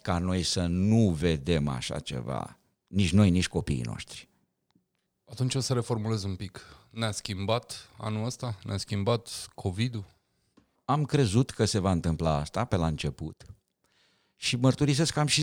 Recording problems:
abrupt cut into speech; at the end

